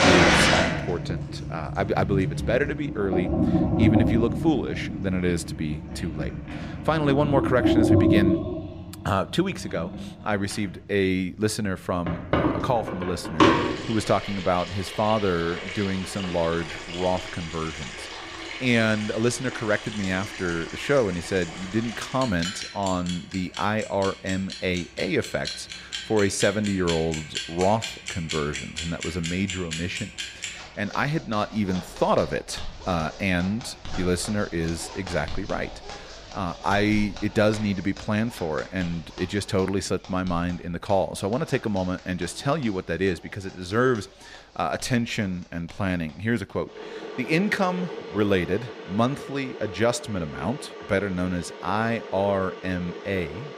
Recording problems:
household noises; loud; throughout; 3 dB below the speech

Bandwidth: 14.5 kHz